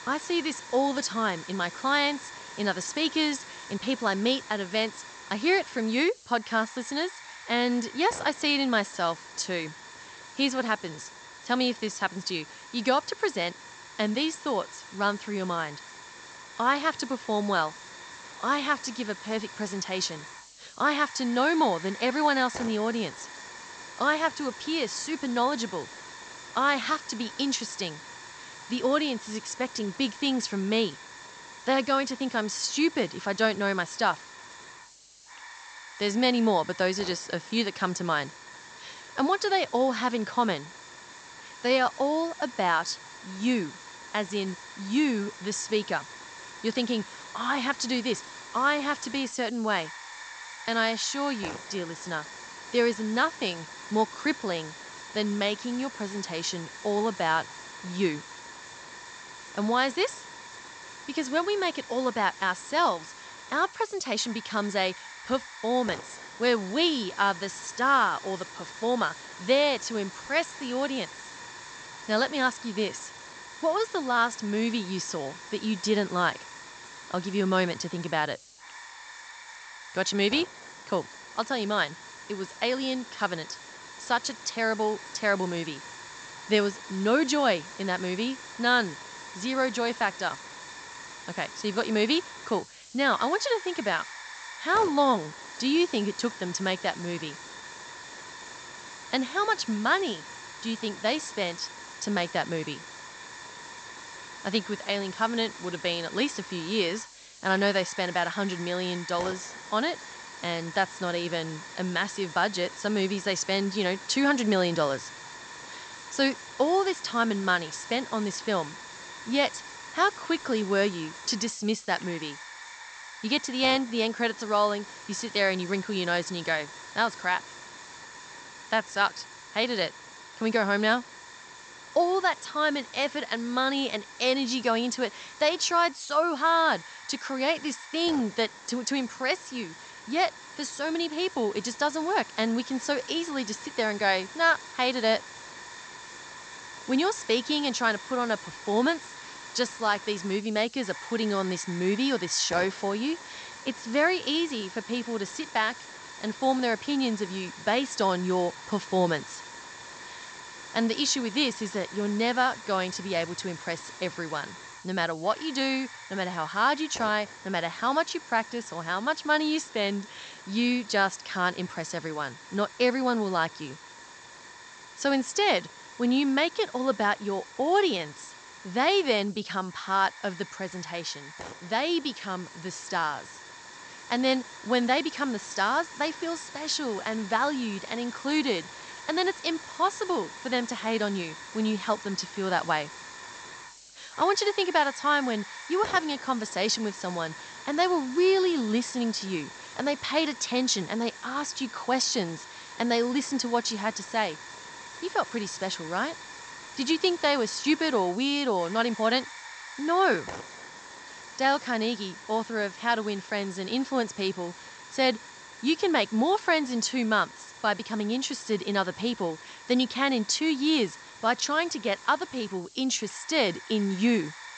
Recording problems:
high frequencies cut off; noticeable; nothing above 8 kHz
hiss; noticeable; throughout; 15 dB below the speech

